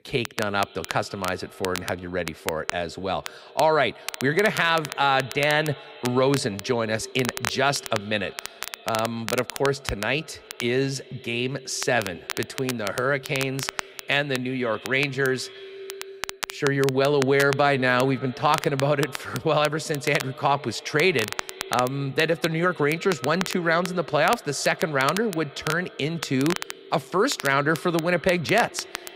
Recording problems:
echo of what is said; faint; throughout; 160 ms later, 20 dB below the speech
crackle, like an old record; noticeable; 10 dB below the speech

